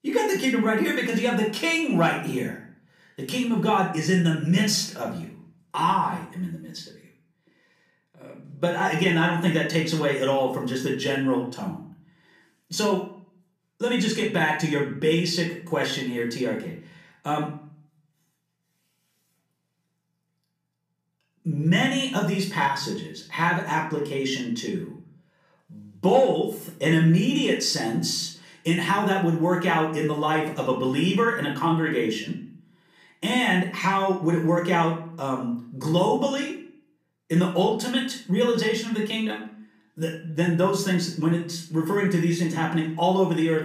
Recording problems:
off-mic speech; far
room echo; slight; dies away in 0.4 s

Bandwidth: 14.5 kHz